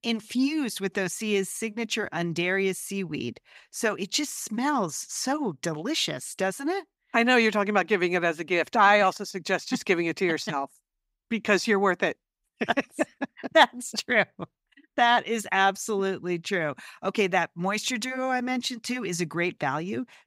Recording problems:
none

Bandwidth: 15.5 kHz